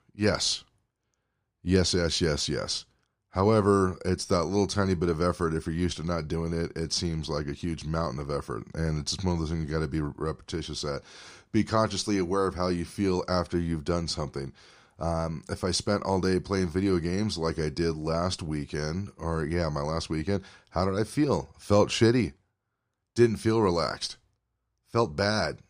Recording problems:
none

